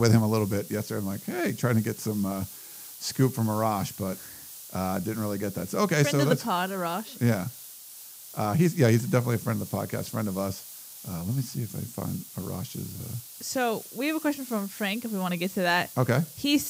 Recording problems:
hiss; noticeable; throughout; 15 dB below the speech
abrupt cut into speech; at the start and the end

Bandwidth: 15.5 kHz